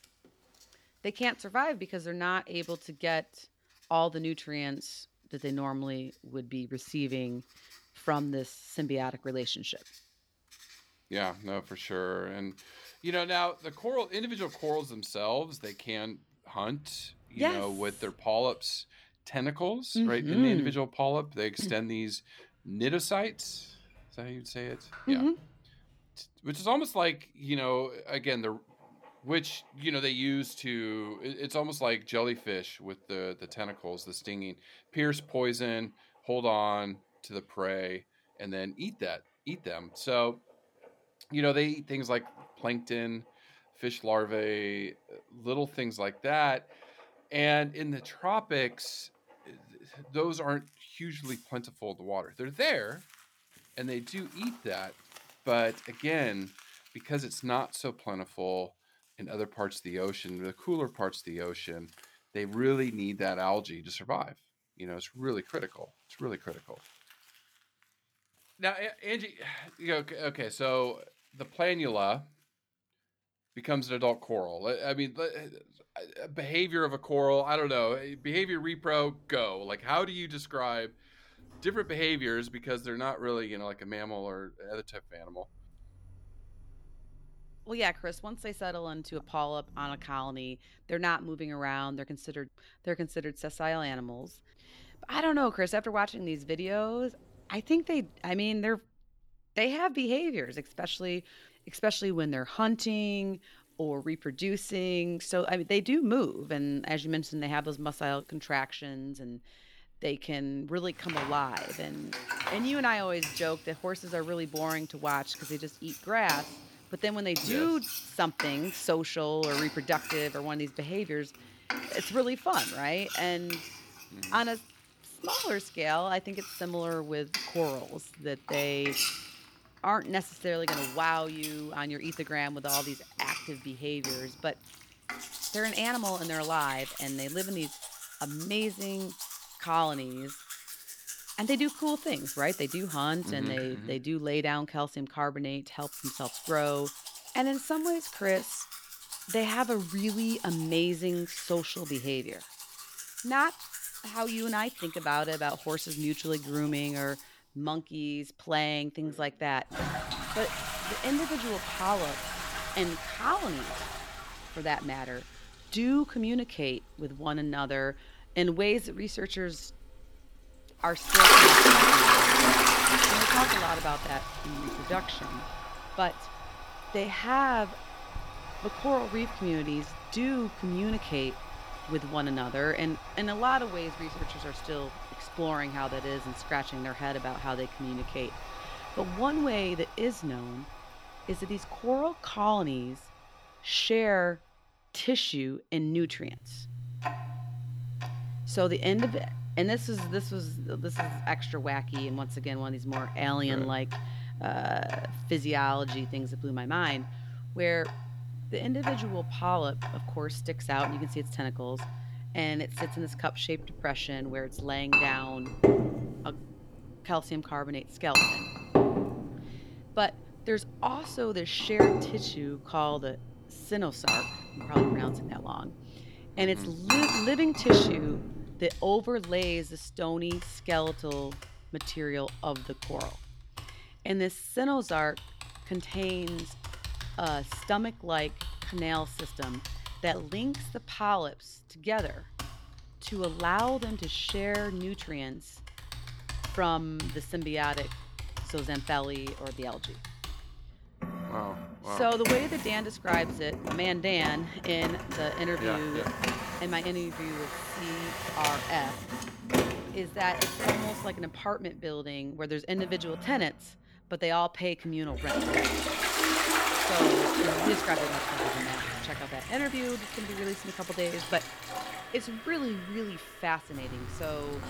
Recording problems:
household noises; very loud; throughout; 1 dB above the speech

